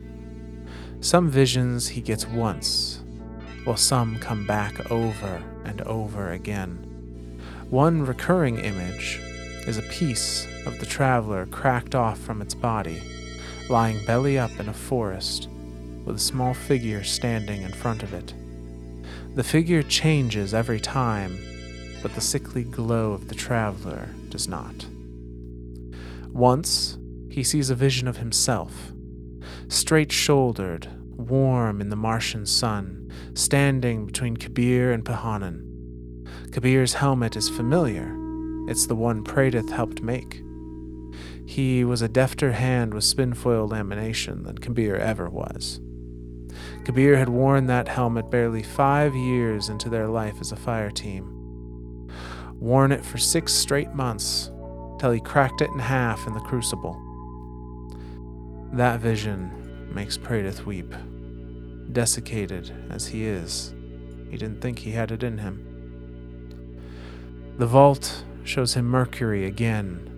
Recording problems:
background music; noticeable; throughout; 20 dB below the speech
electrical hum; faint; throughout; 60 Hz, 20 dB below the speech

